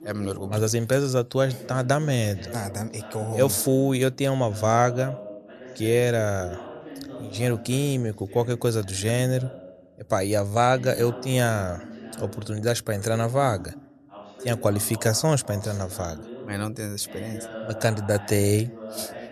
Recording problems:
voice in the background; noticeable; throughout; 15 dB below the speech

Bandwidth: 13.5 kHz